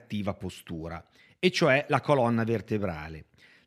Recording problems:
none

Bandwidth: 14.5 kHz